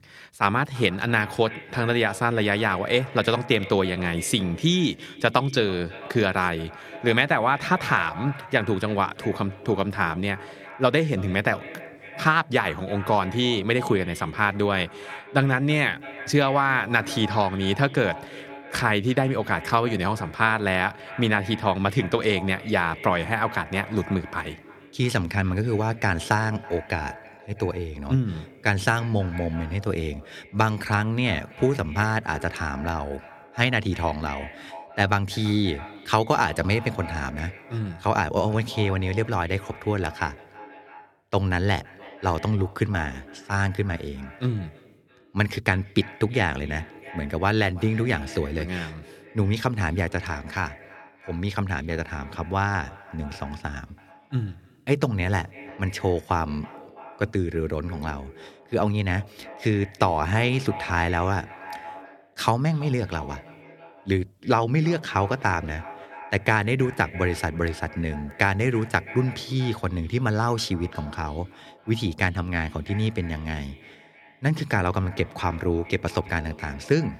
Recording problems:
echo of what is said; noticeable; throughout; 330 ms later, 15 dB below the speech

